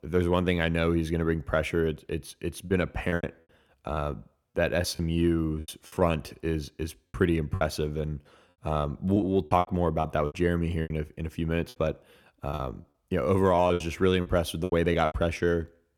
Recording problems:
choppy; very; 10% of the speech affected

